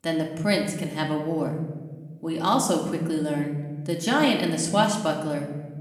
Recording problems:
room echo; slight; dies away in 1 s
off-mic speech; somewhat distant

